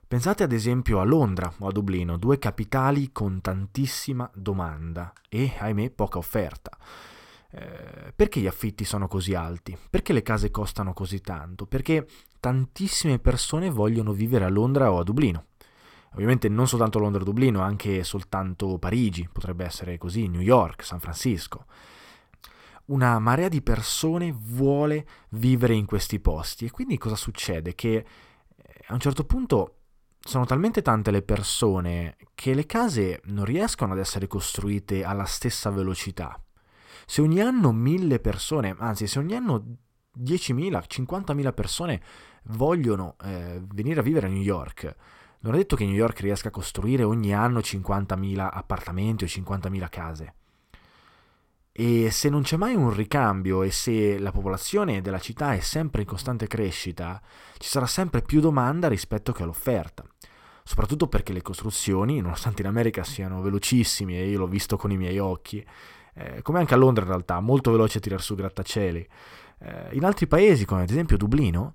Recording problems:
none

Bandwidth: 16.5 kHz